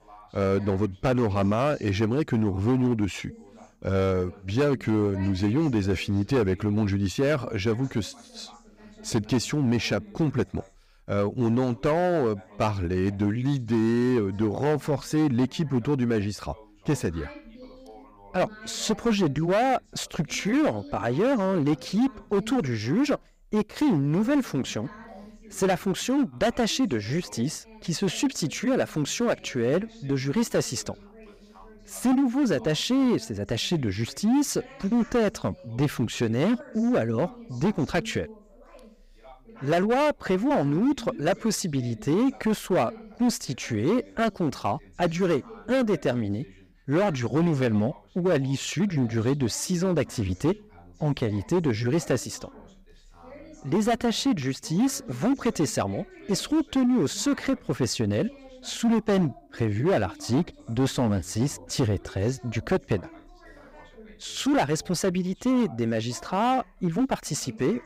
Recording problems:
distortion; slight; 8% of the sound clipped
background chatter; faint; throughout; 2 voices, 20 dB below the speech

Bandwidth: 15.5 kHz